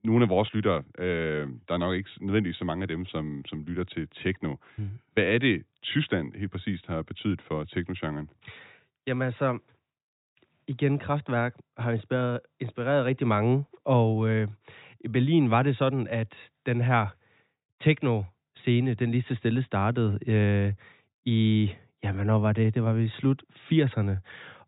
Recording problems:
high frequencies cut off; severe; nothing above 4 kHz

